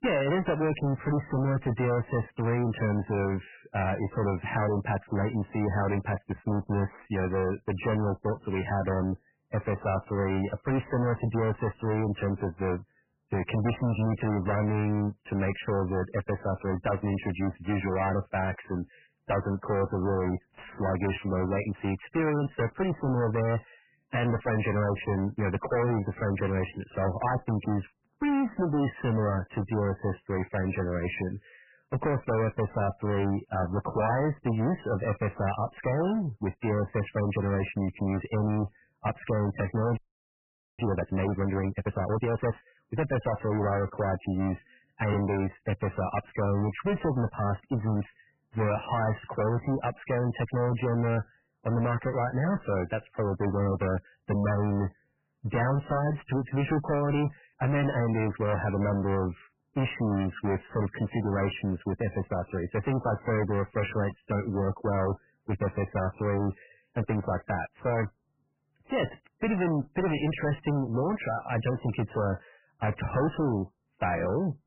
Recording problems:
distortion; heavy; 22% of the sound clipped
garbled, watery; badly; nothing above 3 kHz
audio freezing; at 40 s for 1 s

